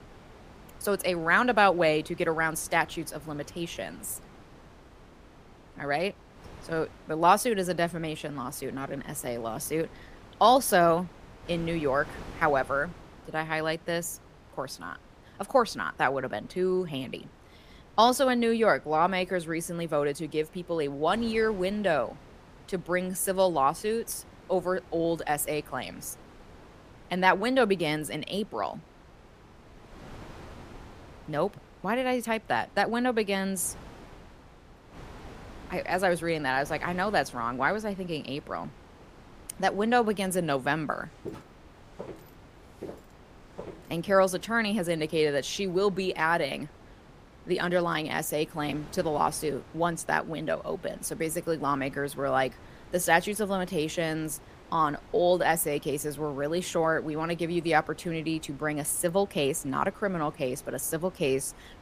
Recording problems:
wind noise on the microphone; occasional gusts; 25 dB below the speech
footsteps; faint; from 41 to 44 s; peak 15 dB below the speech

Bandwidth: 15 kHz